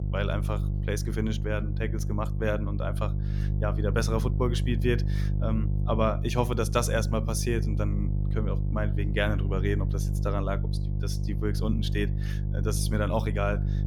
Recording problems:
electrical hum; noticeable; throughout; 50 Hz, 10 dB below the speech

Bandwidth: 18.5 kHz